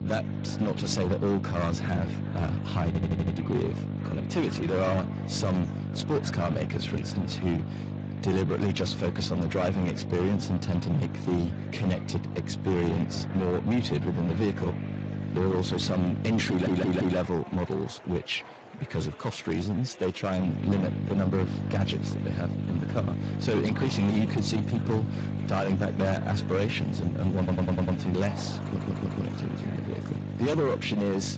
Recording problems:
distortion; heavy; 15% of the sound clipped
garbled, watery; slightly; nothing above 7.5 kHz
electrical hum; loud; until 17 s and from 20 s on; 50 Hz, 9 dB below the speech
murmuring crowd; noticeable; throughout; 20 dB below the speech
audio stuttering; 4 times, first at 3 s

